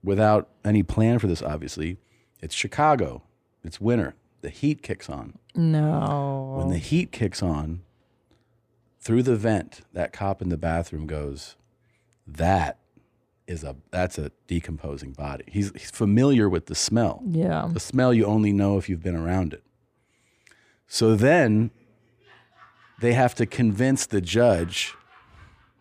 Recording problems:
none

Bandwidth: 15 kHz